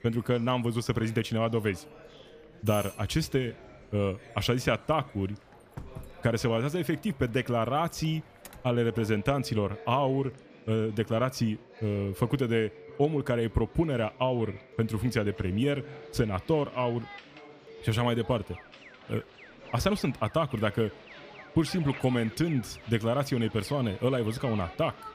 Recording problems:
alarms or sirens; faint; throughout; 20 dB below the speech
chatter from many people; faint; throughout; 20 dB below the speech

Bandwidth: 15 kHz